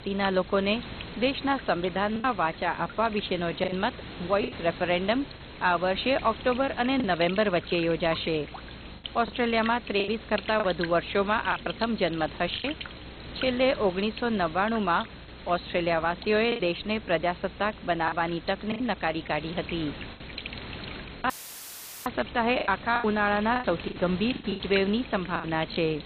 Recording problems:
garbled, watery; badly; nothing above 4 kHz
electrical hum; noticeable; throughout; 60 Hz, 15 dB below the speech
hiss; noticeable; throughout; 15 dB below the speech
choppy; very; 7% of the speech affected
audio cutting out; filled with static; at 21 s for 1 s

